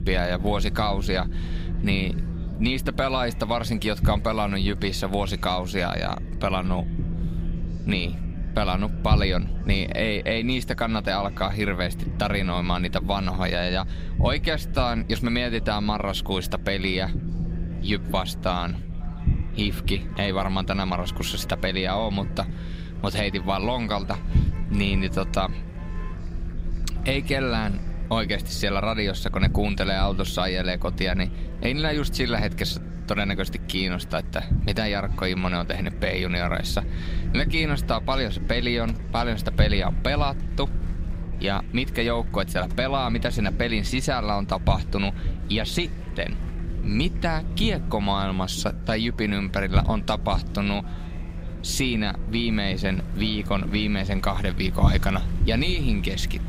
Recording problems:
low rumble; noticeable; throughout; 15 dB below the speech
traffic noise; faint; throughout; 25 dB below the speech
murmuring crowd; faint; throughout; 20 dB below the speech

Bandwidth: 15.5 kHz